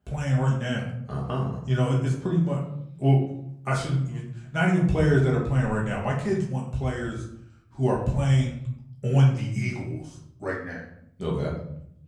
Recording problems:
off-mic speech; far
room echo; slight; dies away in 0.7 s

